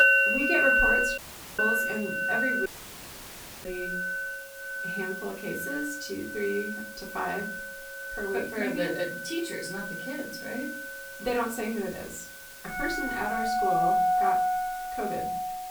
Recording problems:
off-mic speech; far
room echo; slight; dies away in 0.4 s
background music; very loud; throughout; 5 dB above the speech
hiss; noticeable; throughout; 10 dB below the speech
audio cutting out; at 1 s and at 2.5 s for 1 s

